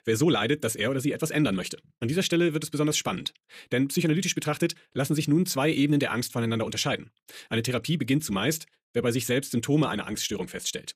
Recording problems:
wrong speed, natural pitch; too fast; 1.5 times normal speed

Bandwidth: 14.5 kHz